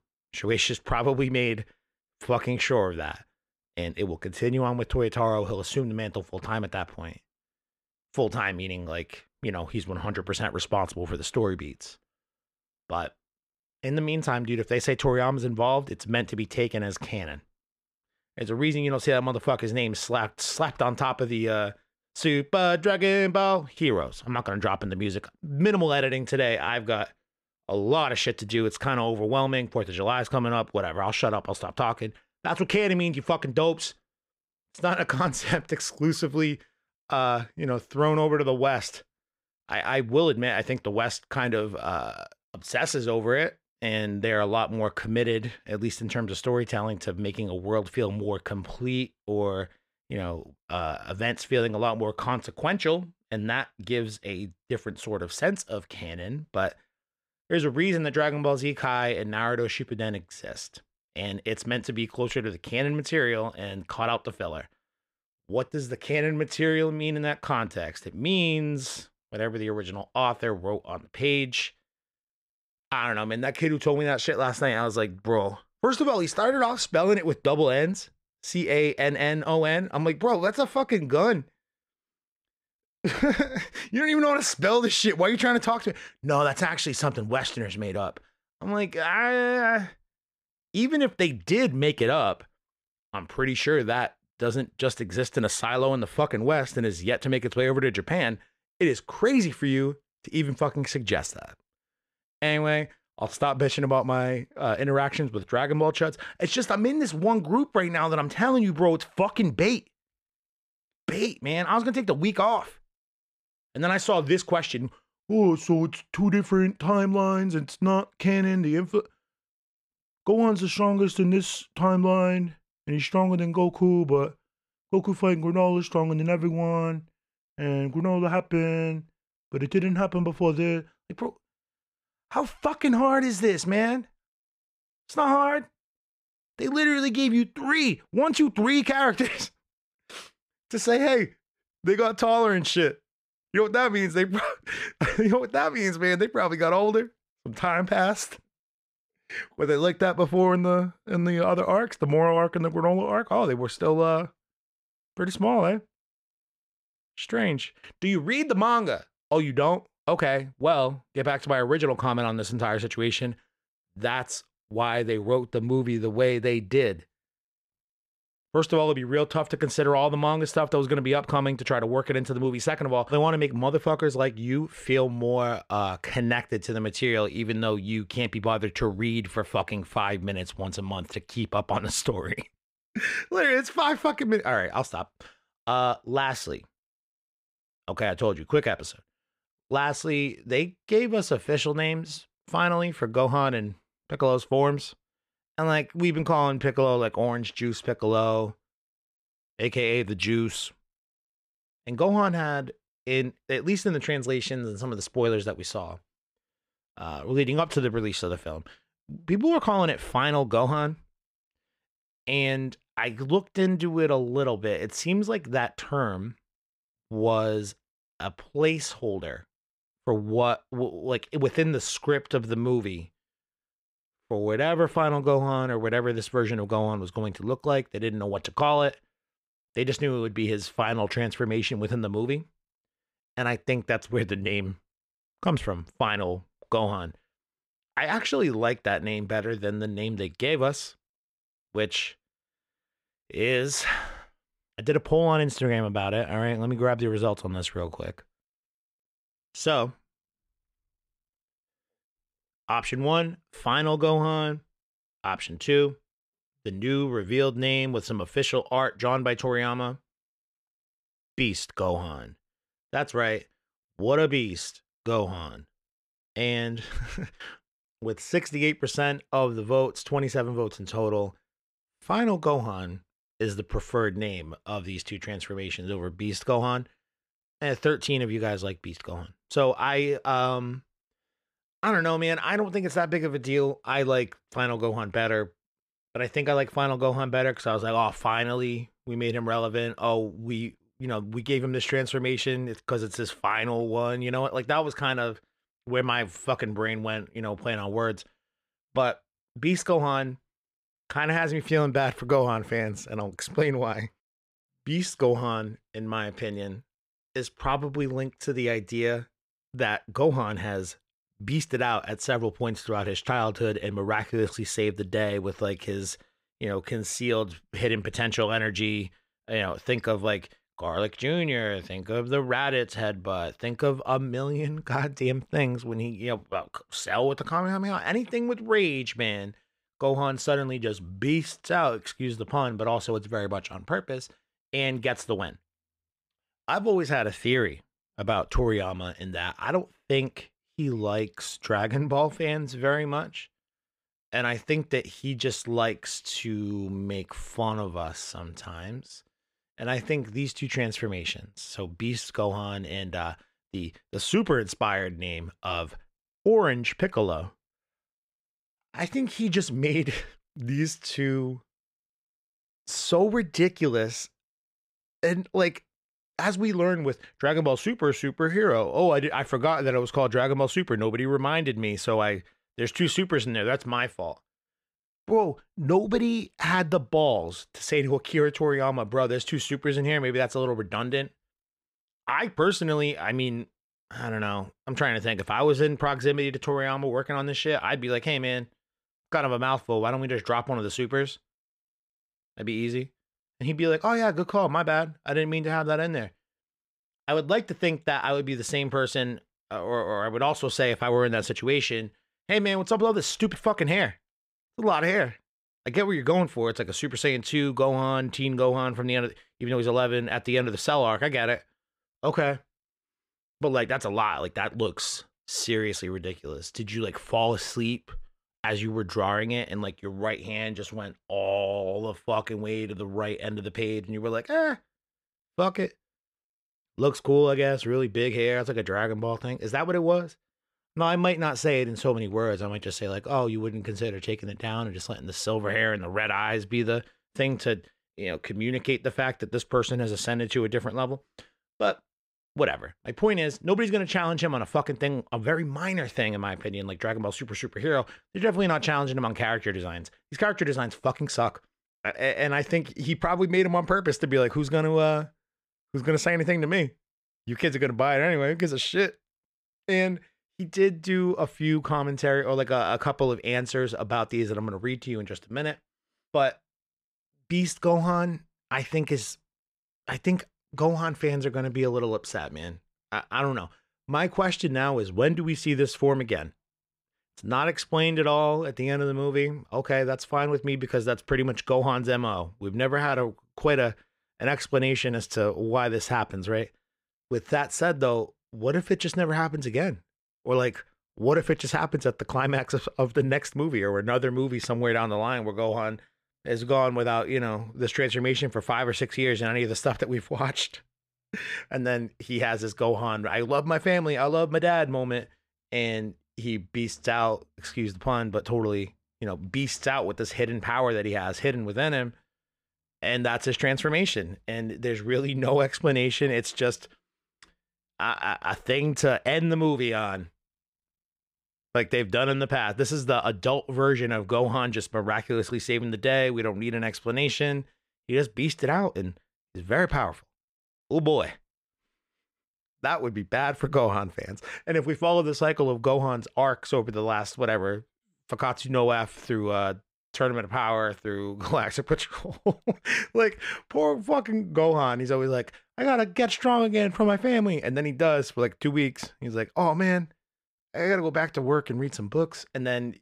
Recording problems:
none

